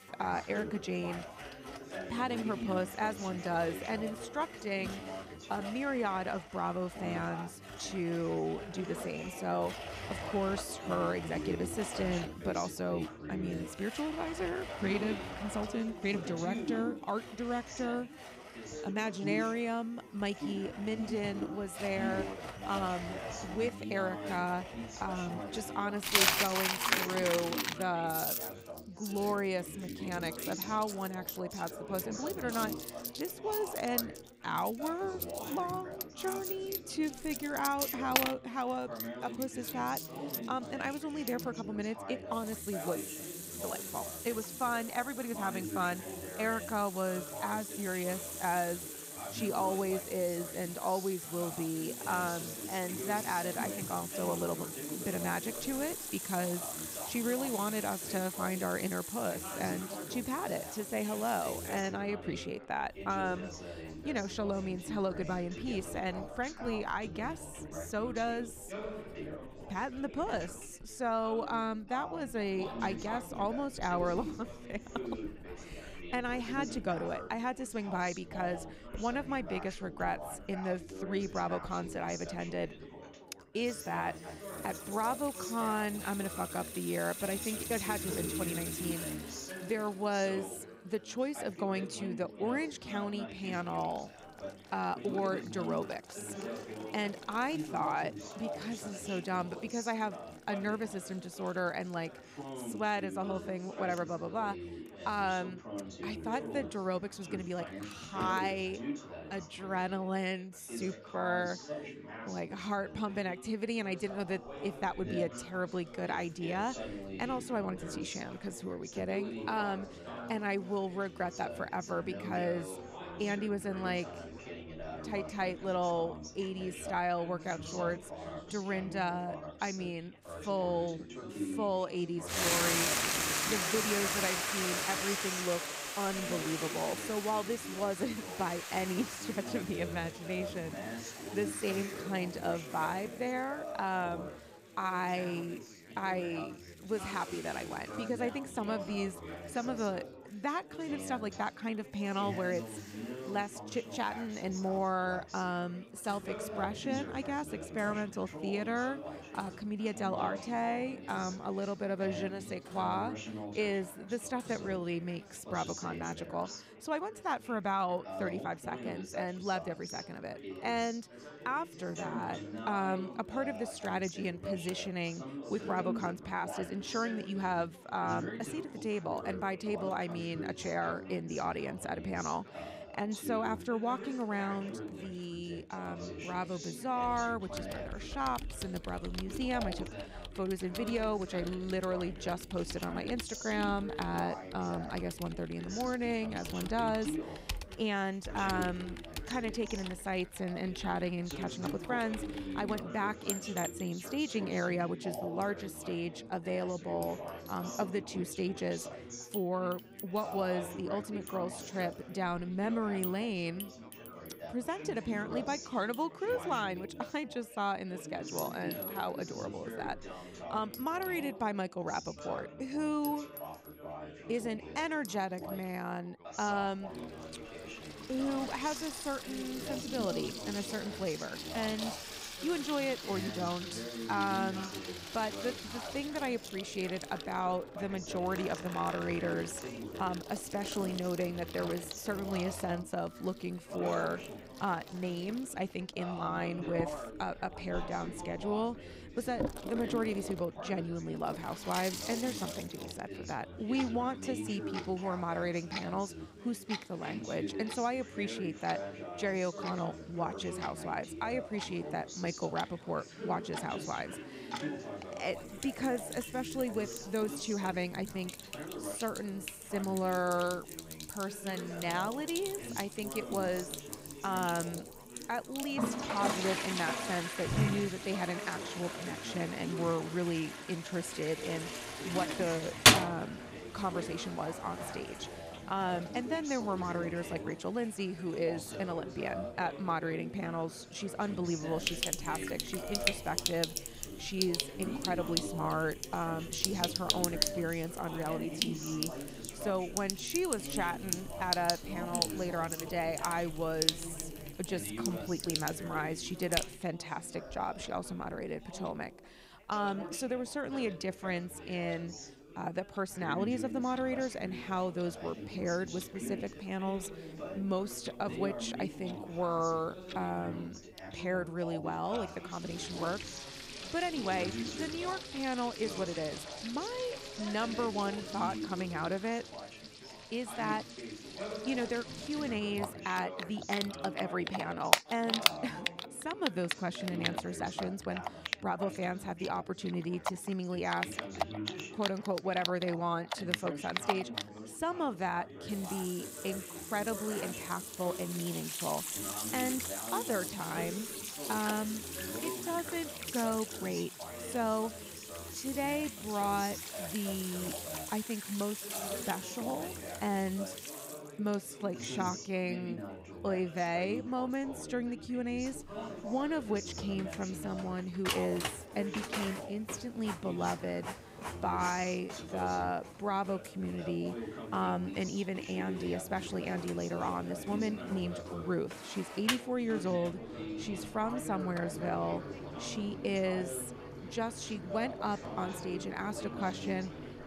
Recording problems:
household noises; loud; throughout; 3 dB below the speech
background chatter; loud; throughout; 4 voices, 8 dB below the speech

